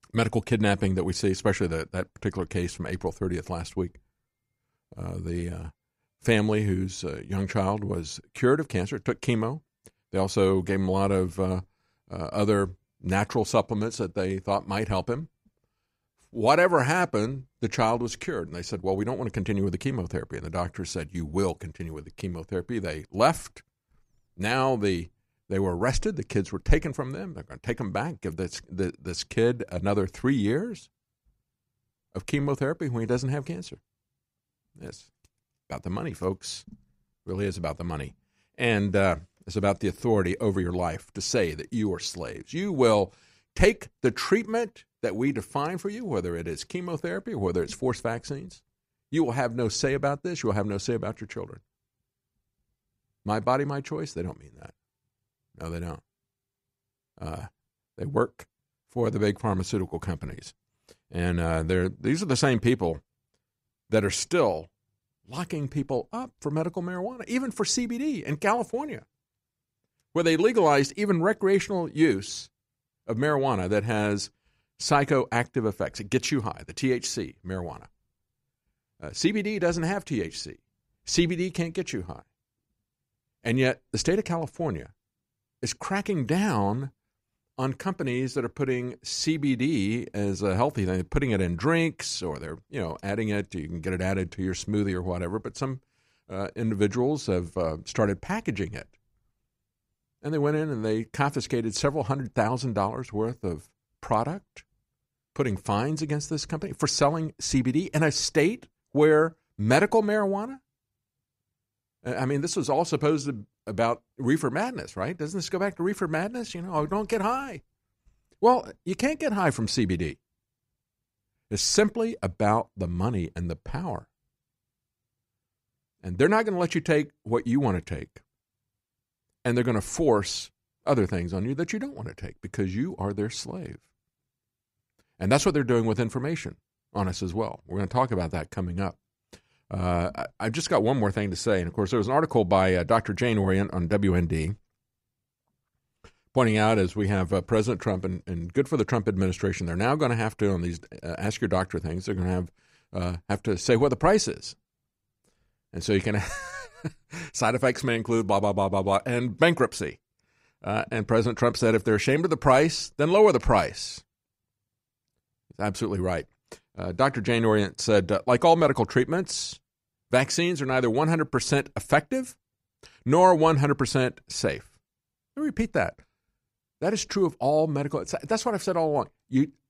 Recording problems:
none

